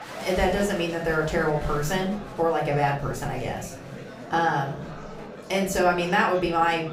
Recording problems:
room echo; slight; dies away in 0.4 s
off-mic speech; somewhat distant
murmuring crowd; noticeable; throughout; 15 dB below the speech
background music; faint; until 2.5 s; 25 dB below the speech

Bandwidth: 15.5 kHz